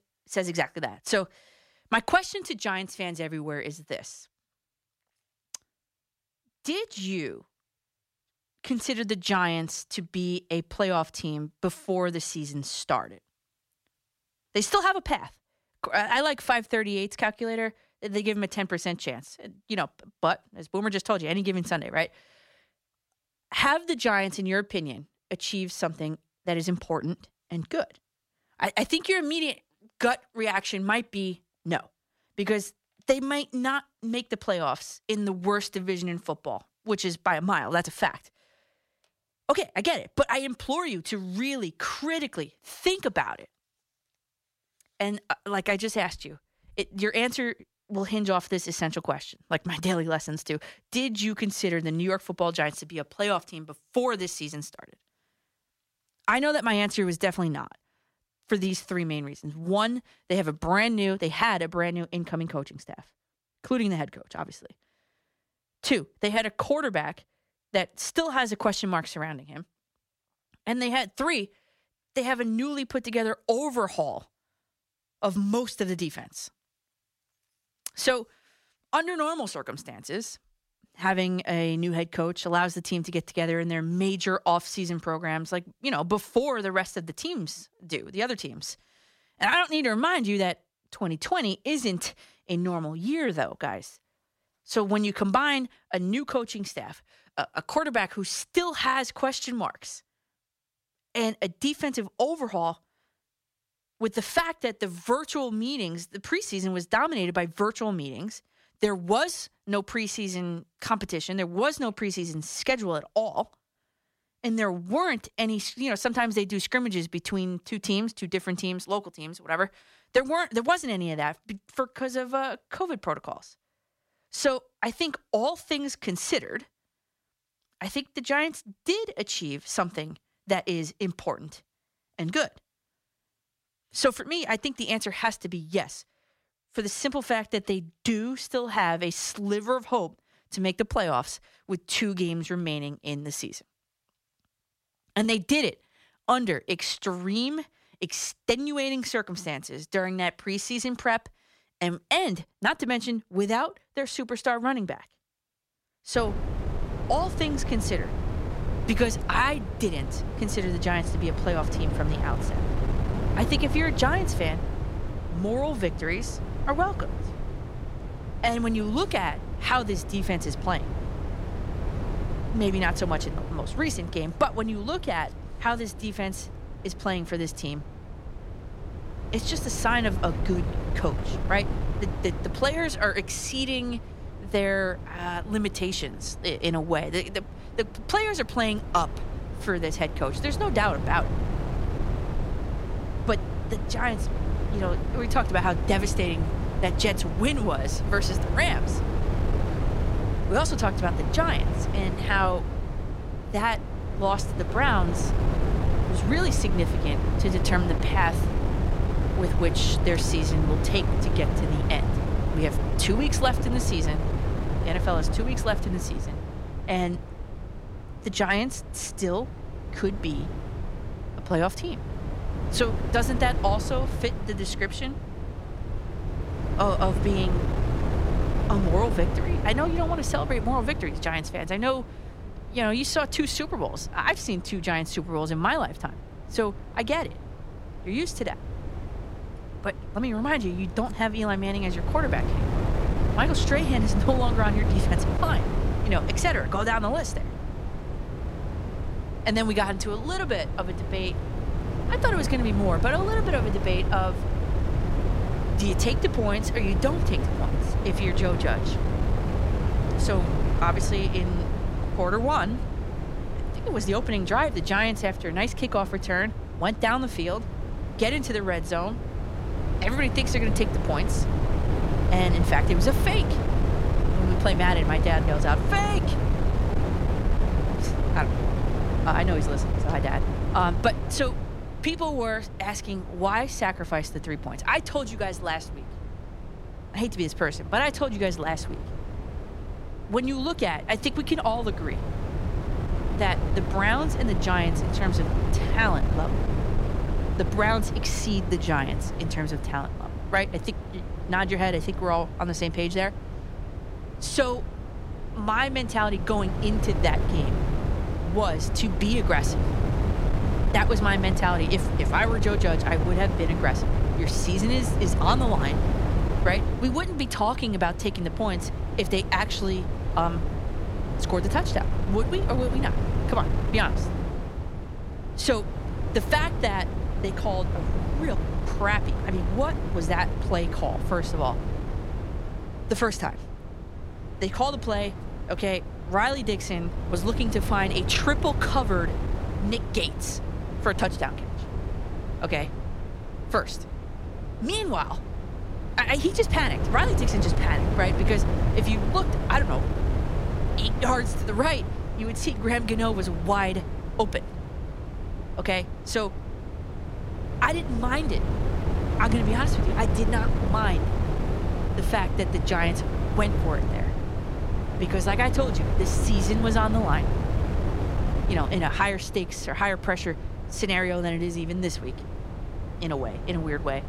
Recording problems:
wind noise on the microphone; heavy; from 2:36 on; 9 dB below the speech

